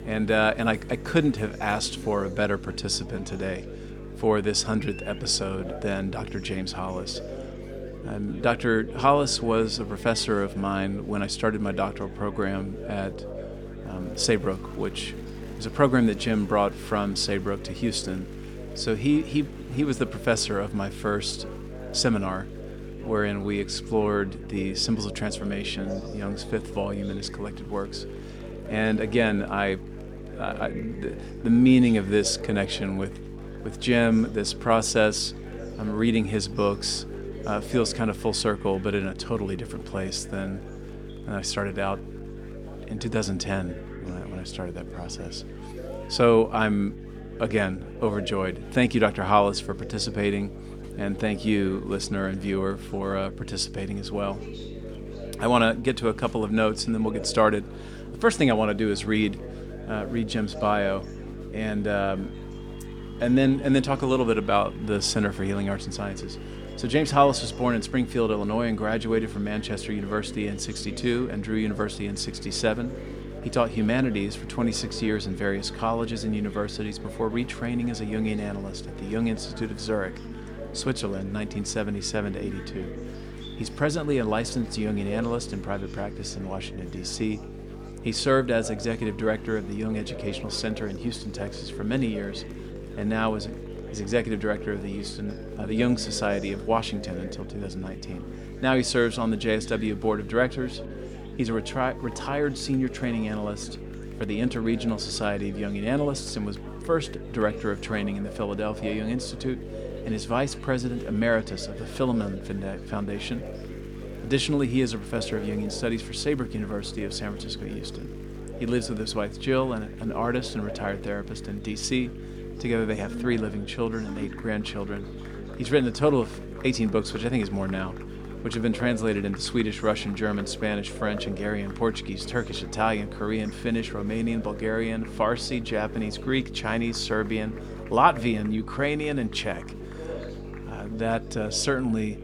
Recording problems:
electrical hum; noticeable; throughout; 50 Hz, 15 dB below the speech
chatter from many people; noticeable; throughout; 15 dB below the speech

